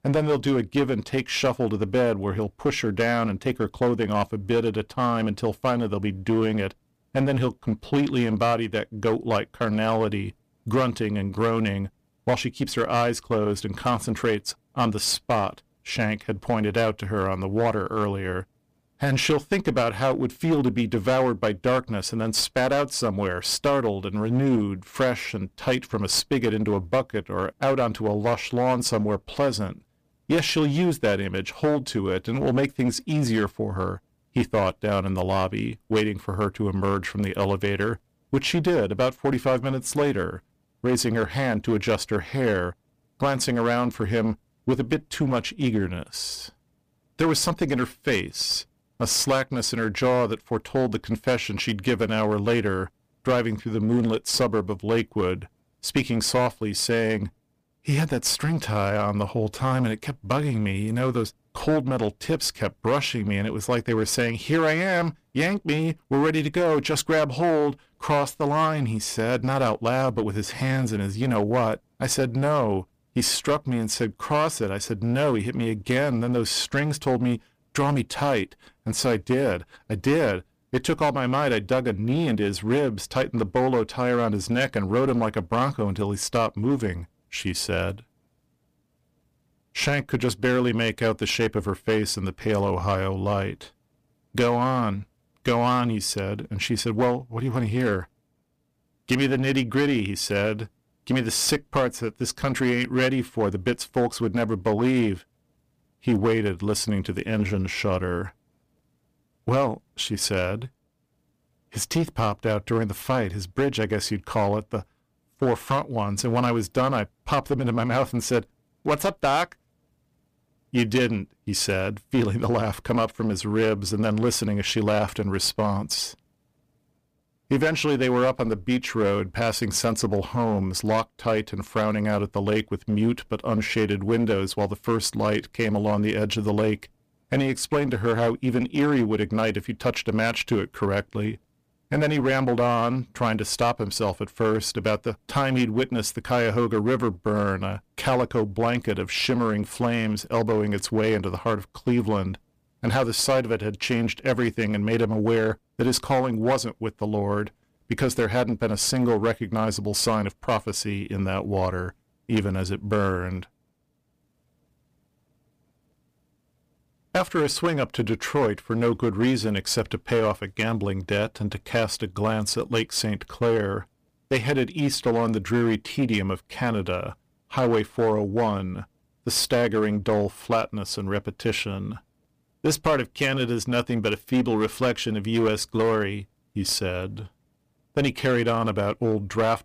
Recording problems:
distortion; slight; 8% of the sound clipped

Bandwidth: 15 kHz